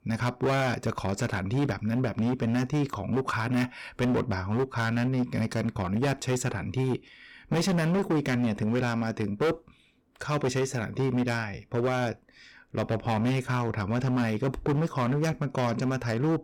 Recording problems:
distortion; heavy; 14% of the sound clipped

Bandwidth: 17.5 kHz